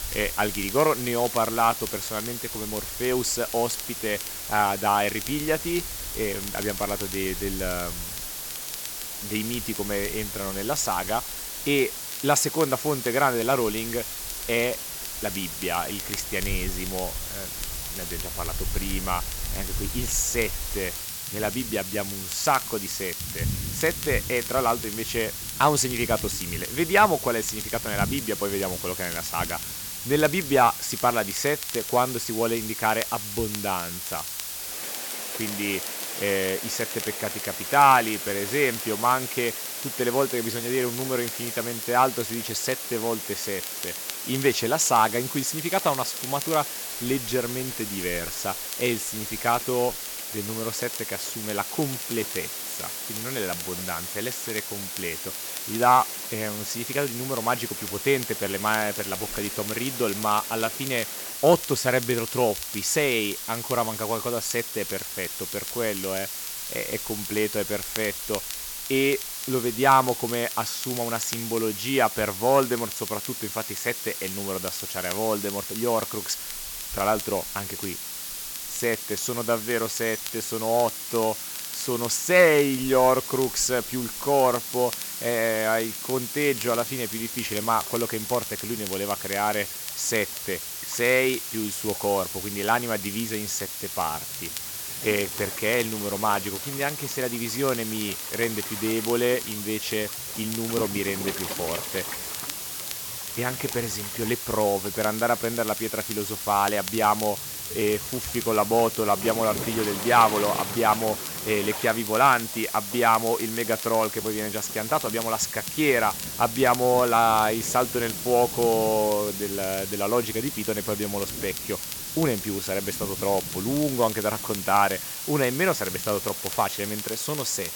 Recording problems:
hiss; loud; throughout; 5 dB below the speech
rain or running water; noticeable; throughout; 15 dB below the speech
crackle, like an old record; noticeable; 15 dB below the speech

